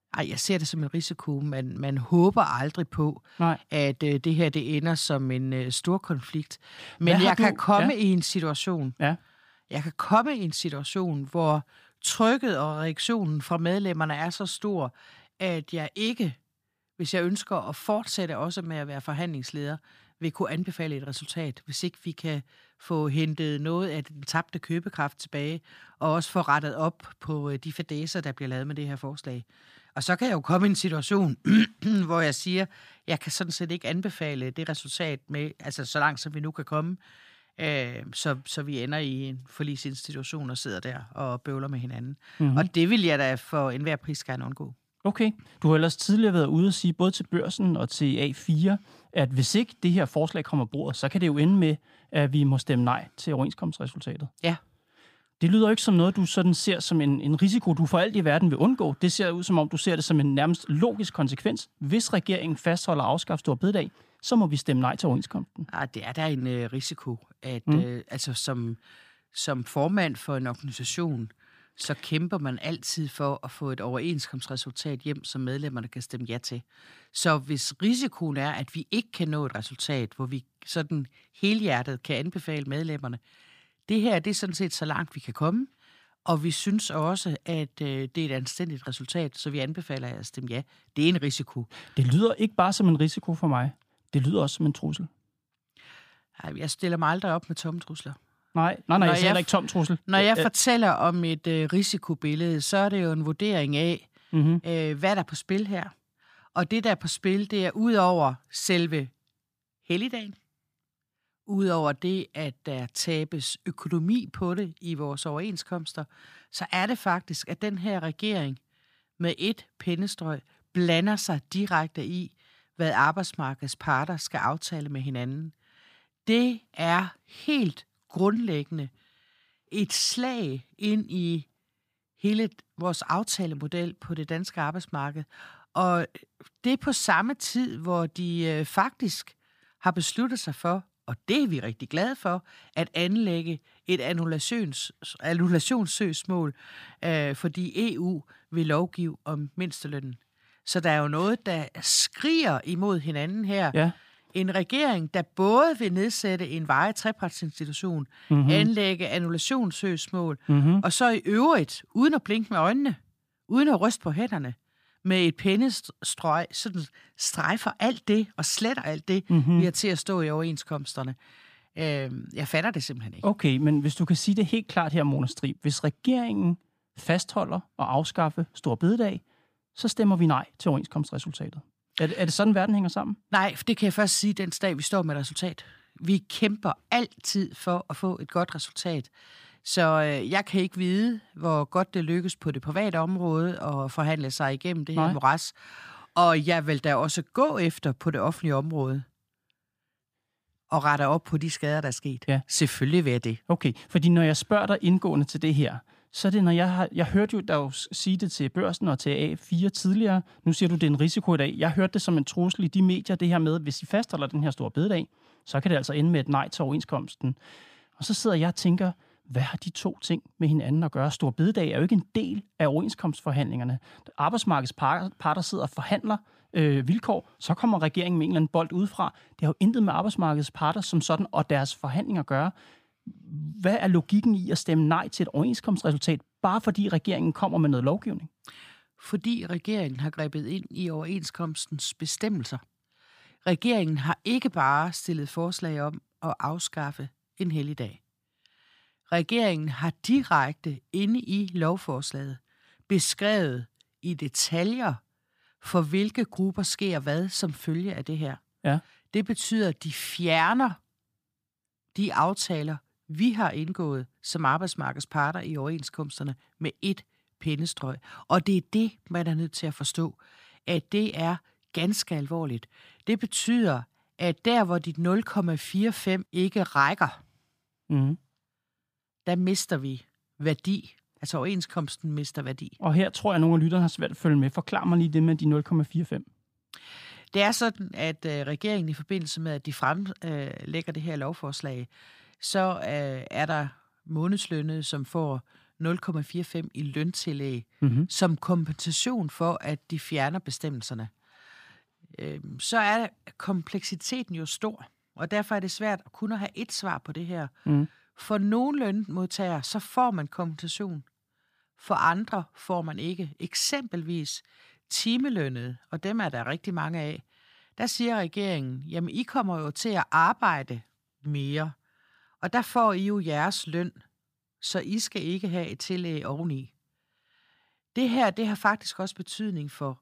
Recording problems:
none

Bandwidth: 15 kHz